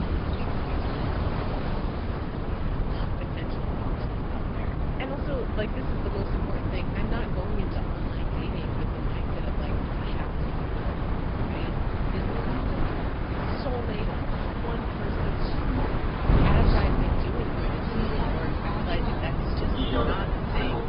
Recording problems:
high frequencies cut off; noticeable; nothing above 5 kHz
garbled, watery; slightly
train or aircraft noise; very loud; throughout; 3 dB above the speech
wind noise on the microphone; heavy; 3 dB above the speech

